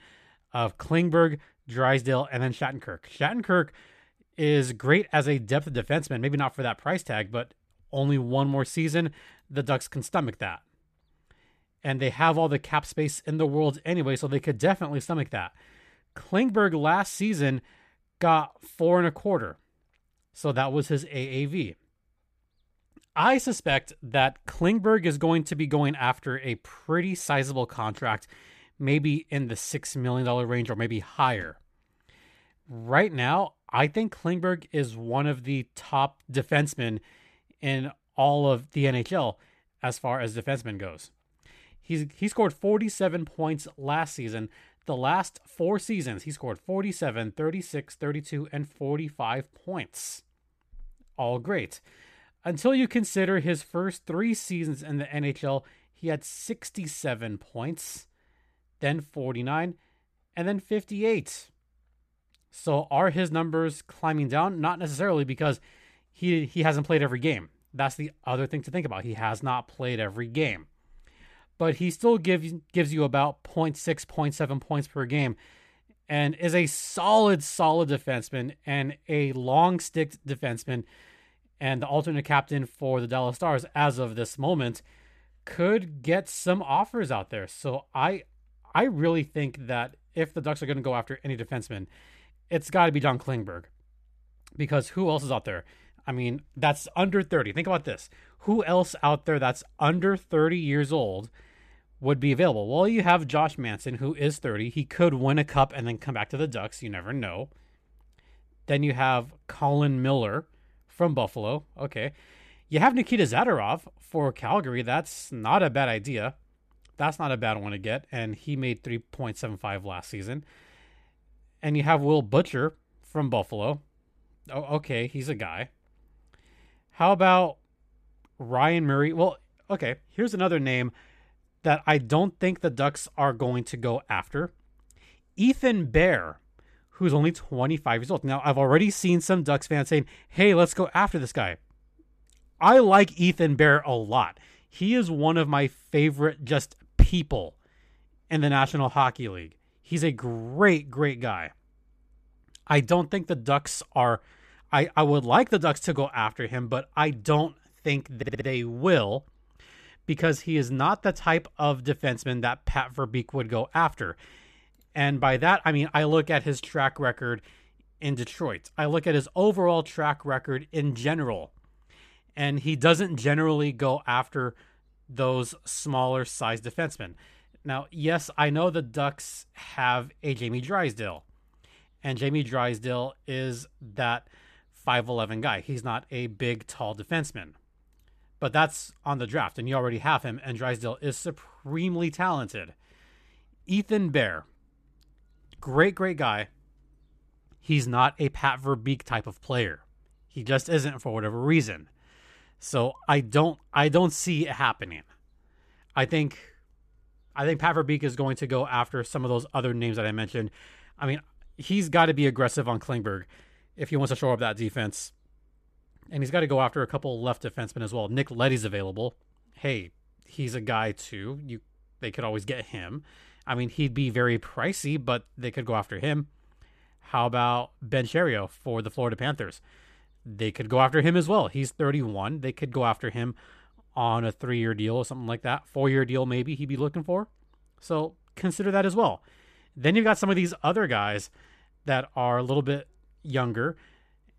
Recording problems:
audio stuttering; at 2:38

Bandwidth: 14.5 kHz